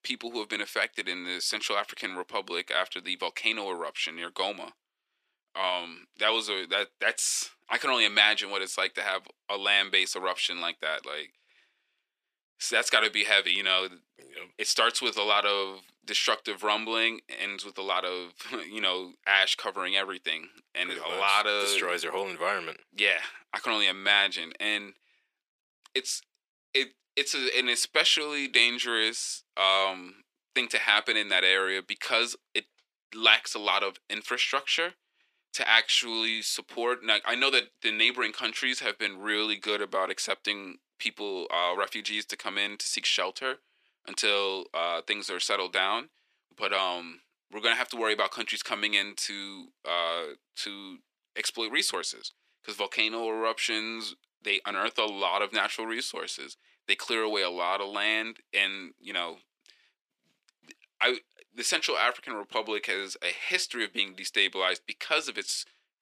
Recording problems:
thin; somewhat; fading below 350 Hz

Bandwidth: 14.5 kHz